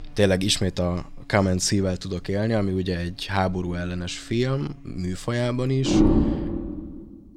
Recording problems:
animal sounds; very loud; throughout; 1 dB above the speech

